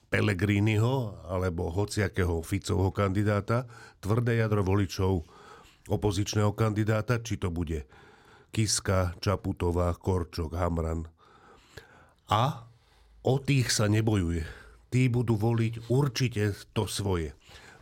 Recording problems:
none

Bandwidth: 16 kHz